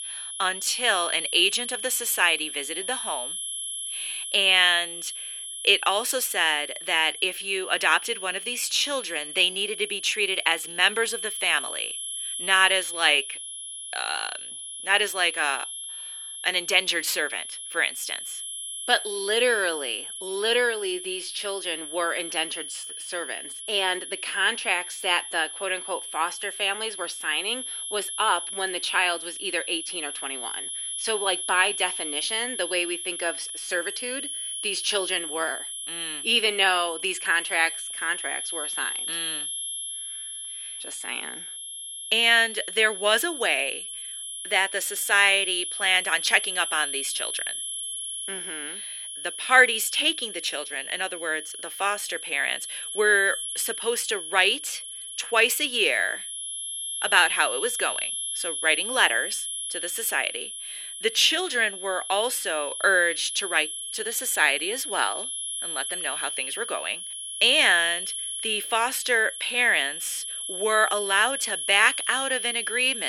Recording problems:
thin; very; fading below 300 Hz
high-pitched whine; loud; throughout; 11 kHz, 7 dB below the speech
abrupt cut into speech; at the end

